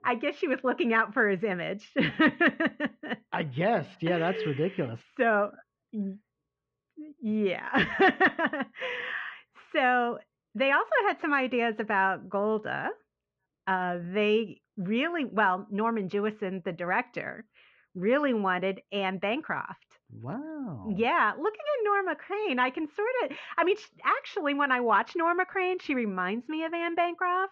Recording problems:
muffled; very; fading above 3 kHz

